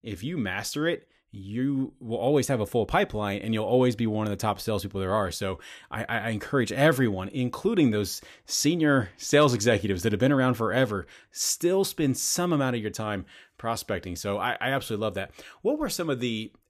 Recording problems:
none

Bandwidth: 14.5 kHz